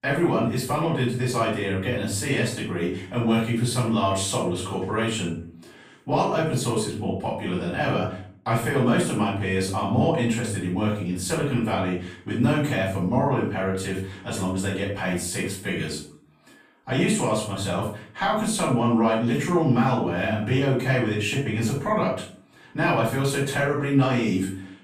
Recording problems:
off-mic speech; far
room echo; noticeable; dies away in 0.4 s

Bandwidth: 15 kHz